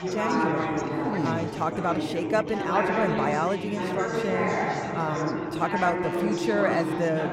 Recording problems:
chatter from many people; very loud; throughout; 1 dB above the speech

